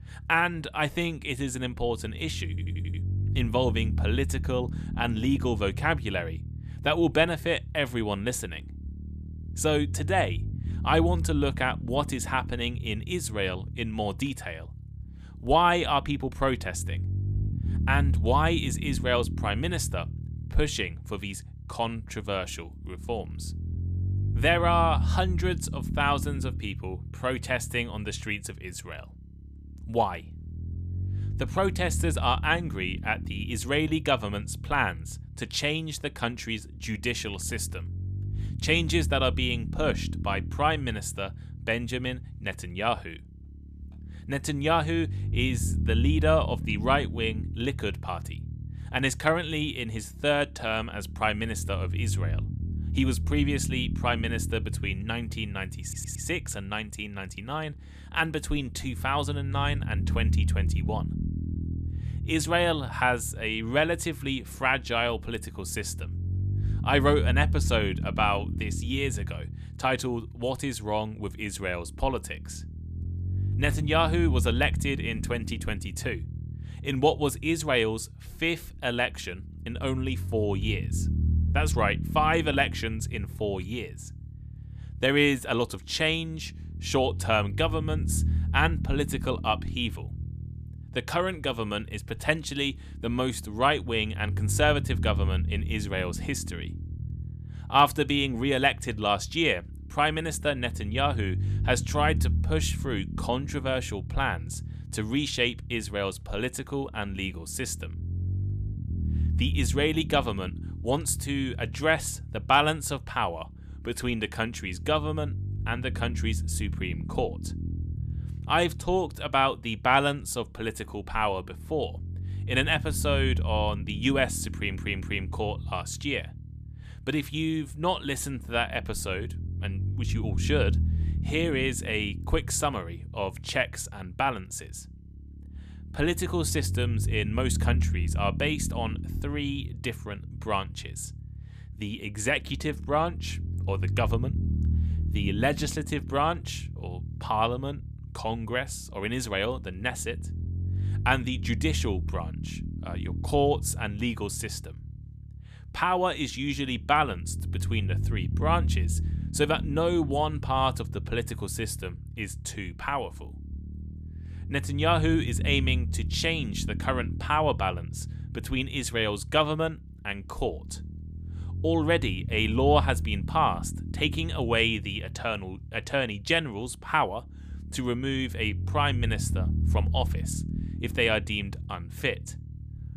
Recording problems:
low rumble; noticeable; throughout; 20 dB below the speech
audio stuttering; at 2.5 s, at 56 s and at 2:05

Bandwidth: 14.5 kHz